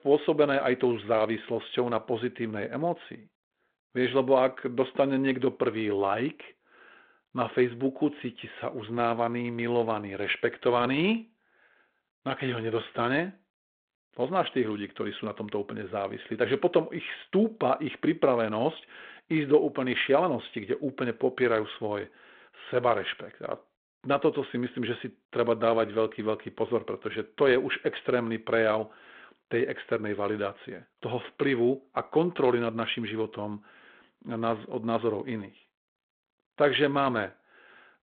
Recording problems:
phone-call audio

